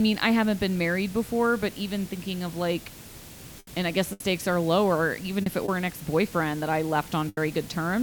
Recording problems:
hiss; noticeable; throughout; 15 dB below the speech
abrupt cut into speech; at the start and the end
choppy; occasionally; from 4 to 7.5 s; 4% of the speech affected

